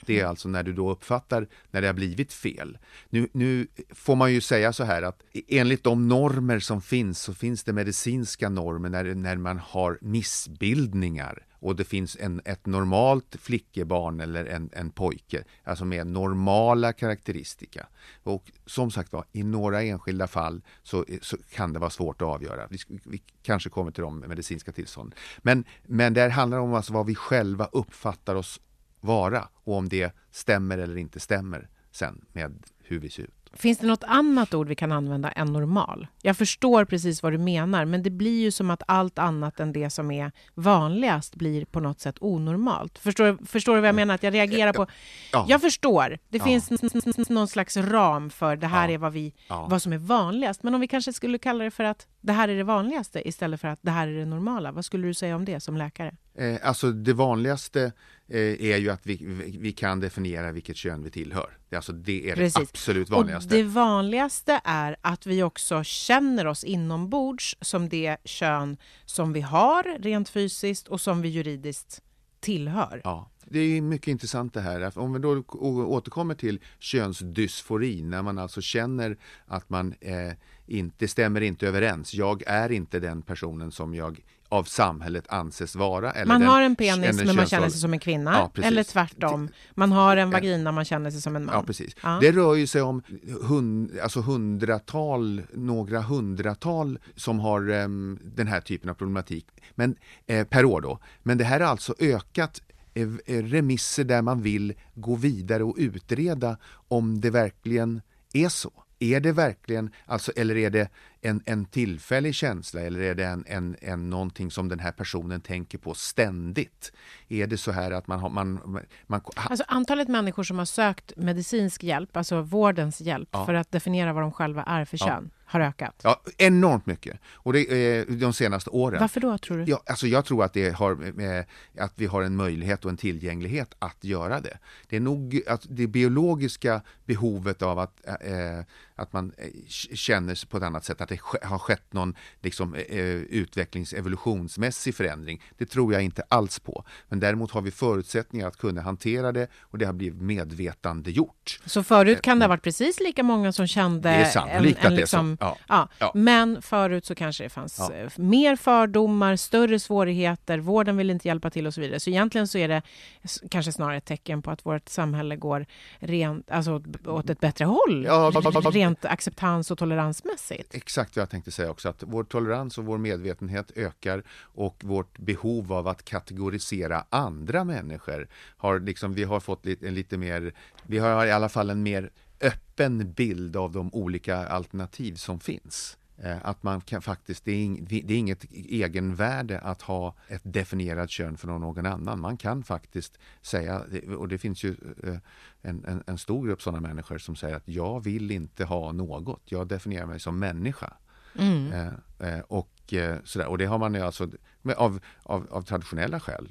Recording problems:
audio stuttering; at 47 s and at 2:48

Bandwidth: 13.5 kHz